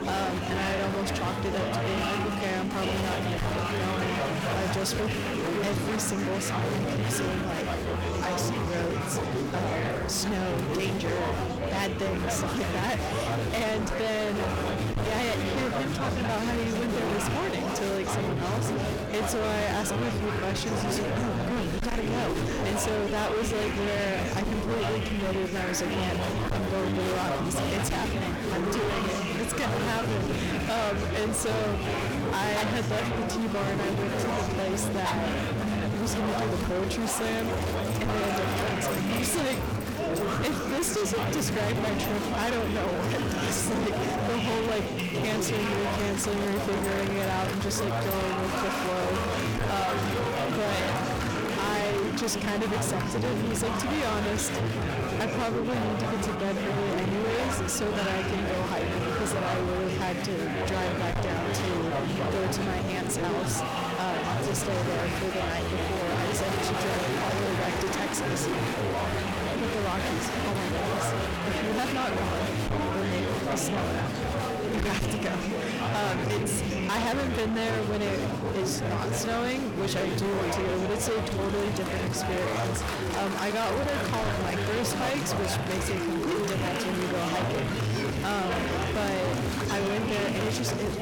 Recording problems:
distortion; heavy; 39% of the sound clipped
chatter from many people; very loud; throughout; 1 dB above the speech
animal sounds; noticeable; throughout; 15 dB below the speech

